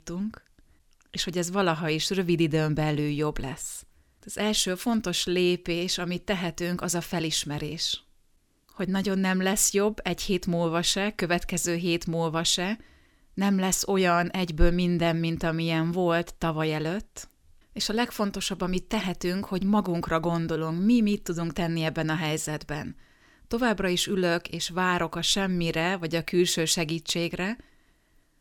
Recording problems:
none

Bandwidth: 17.5 kHz